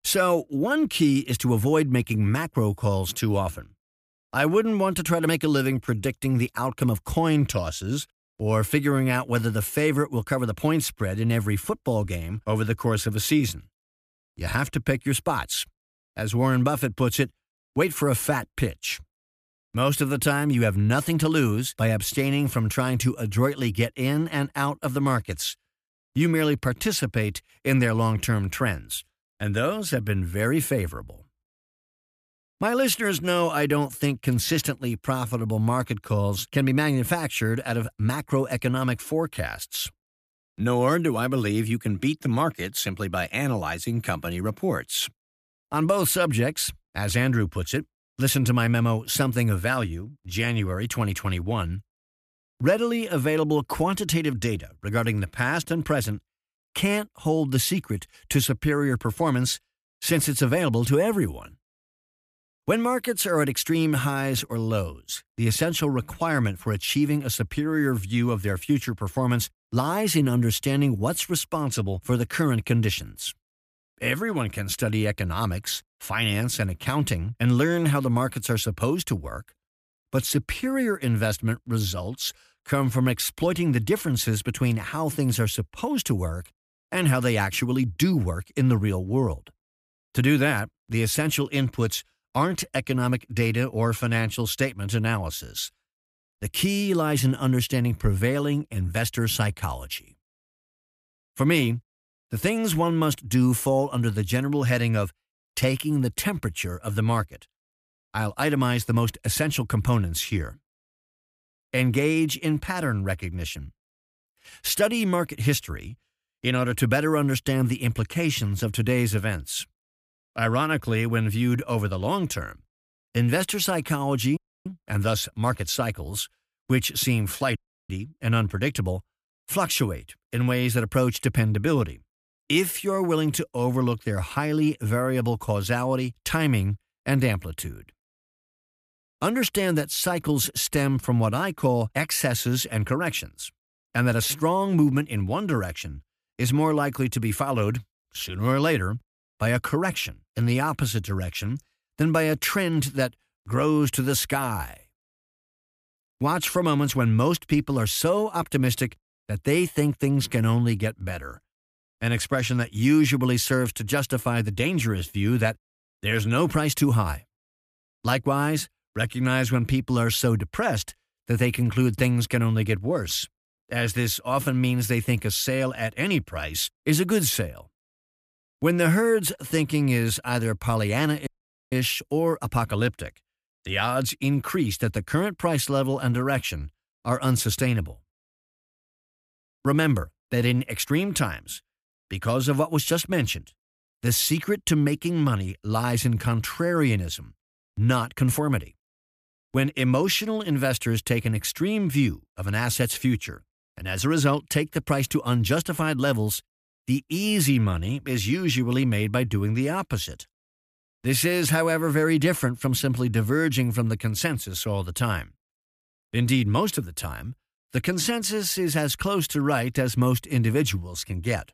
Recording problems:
audio cutting out; at 2:04, at 2:08 and at 3:01

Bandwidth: 14.5 kHz